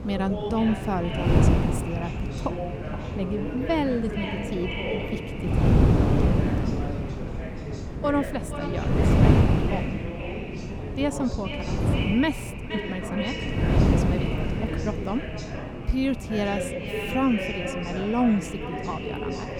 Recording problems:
echo of what is said; strong; throughout; 470 ms later, 9 dB below the speech
wind noise on the microphone; heavy; 1 dB below the speech
background chatter; loud; throughout; 3 voices, 7 dB below the speech

